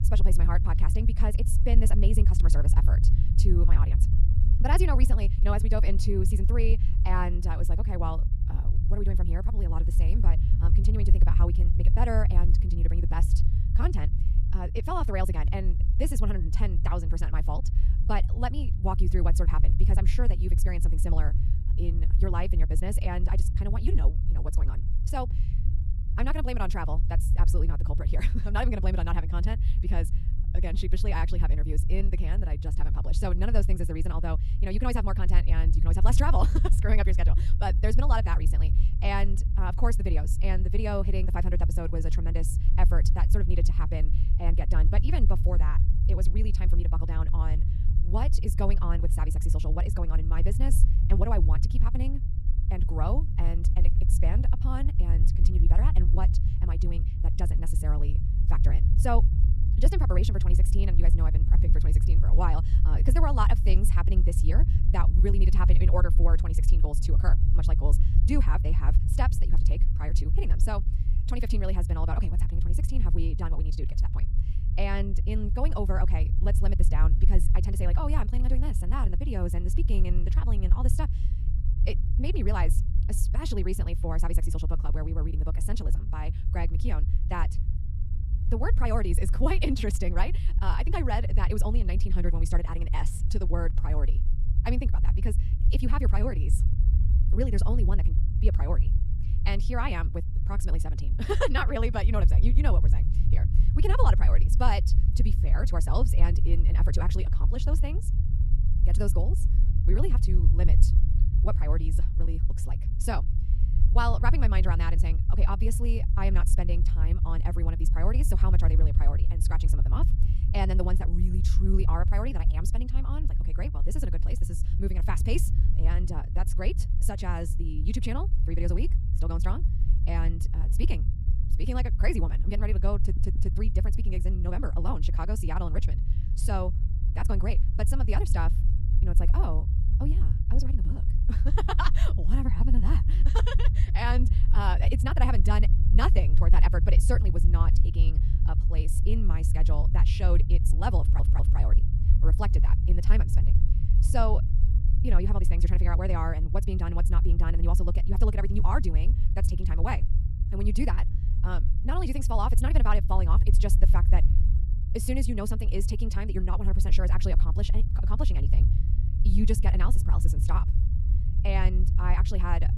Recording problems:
wrong speed, natural pitch; too fast; 1.7 times normal speed
low rumble; loud; throughout; 9 dB below the speech
audio stuttering; at 2:13 and at 2:31

